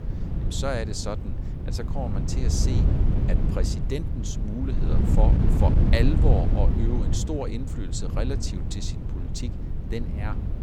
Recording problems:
wind noise on the microphone; heavy; 4 dB below the speech

